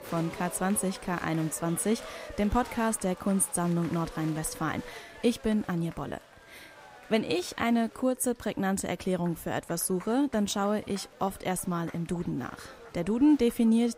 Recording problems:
crowd noise; noticeable; throughout; 20 dB below the speech

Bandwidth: 15.5 kHz